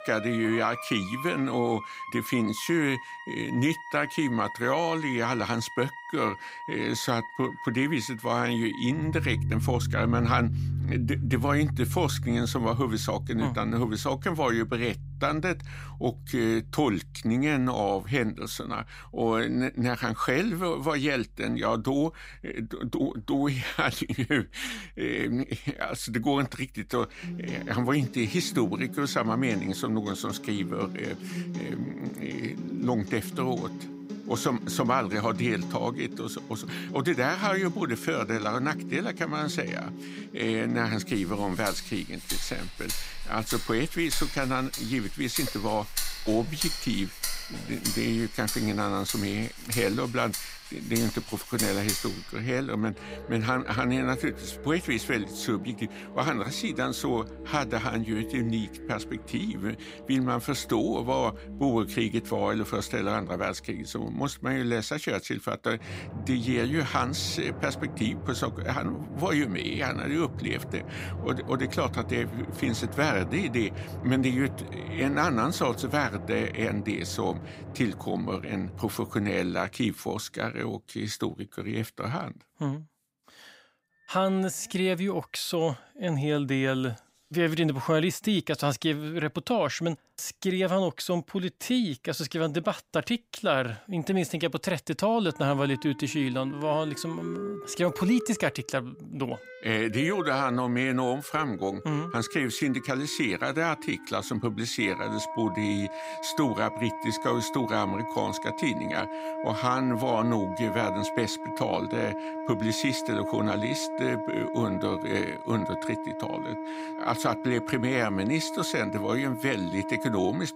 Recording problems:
background music; loud; throughout; 8 dB below the speech

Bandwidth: 15.5 kHz